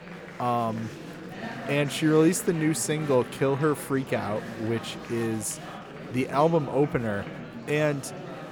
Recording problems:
murmuring crowd; noticeable; throughout; 10 dB below the speech

